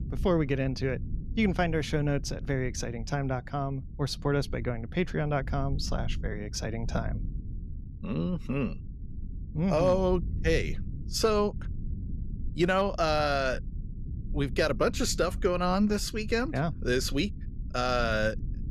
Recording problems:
low rumble; faint; throughout; 20 dB below the speech

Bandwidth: 14 kHz